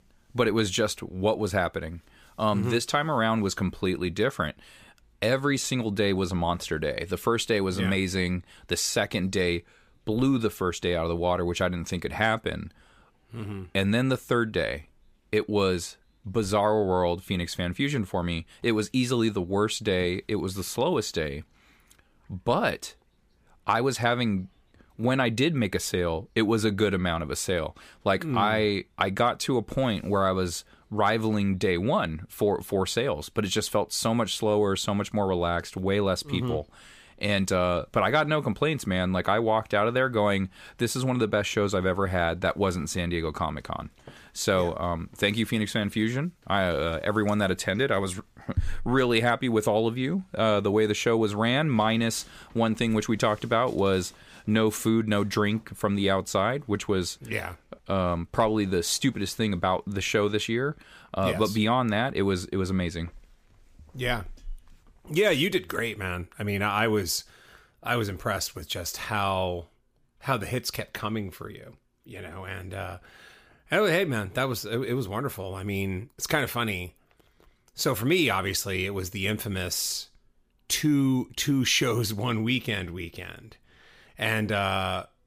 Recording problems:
none

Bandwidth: 15 kHz